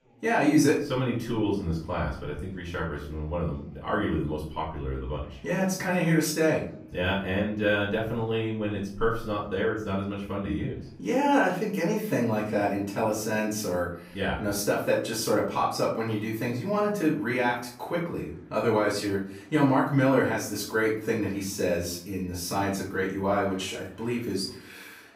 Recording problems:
off-mic speech; far
room echo; noticeable; dies away in 0.5 s
murmuring crowd; faint; throughout; 30 dB below the speech

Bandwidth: 15.5 kHz